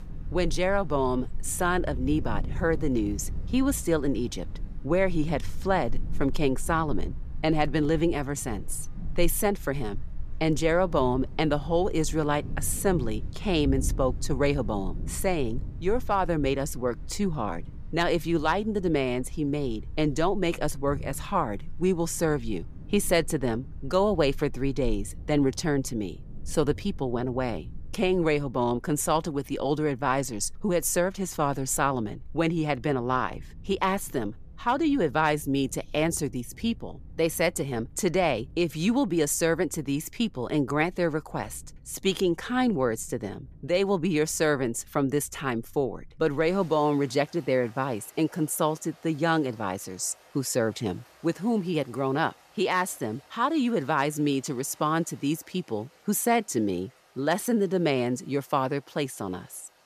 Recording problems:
rain or running water; noticeable; throughout; 15 dB below the speech

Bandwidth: 14.5 kHz